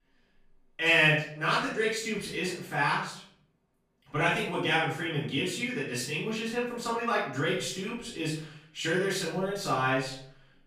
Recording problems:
off-mic speech; far
room echo; noticeable; dies away in 0.6 s

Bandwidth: 15 kHz